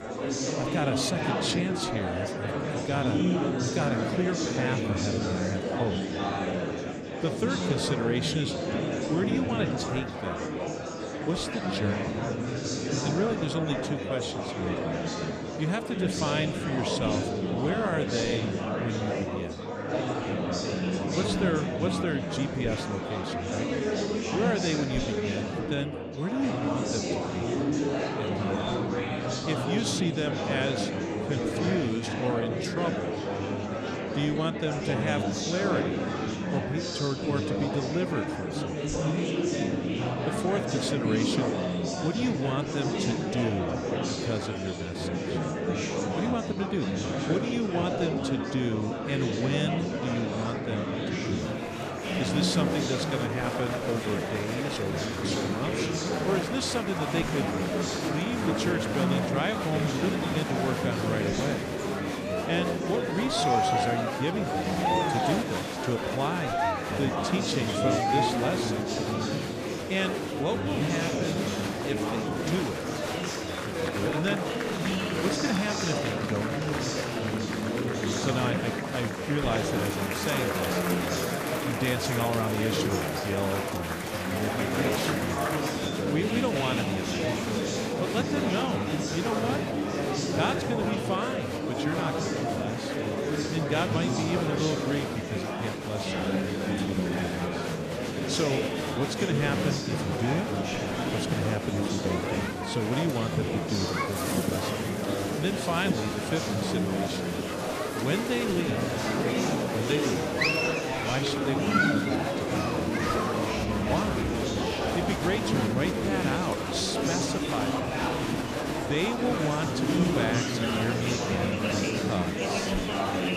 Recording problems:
murmuring crowd; very loud; throughout; 3 dB above the speech

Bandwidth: 14.5 kHz